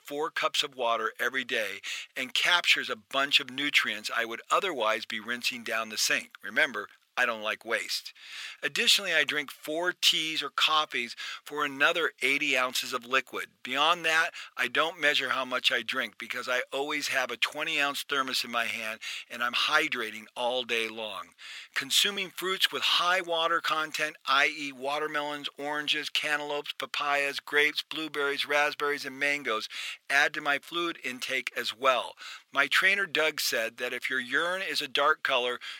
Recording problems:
thin; very; fading below 600 Hz

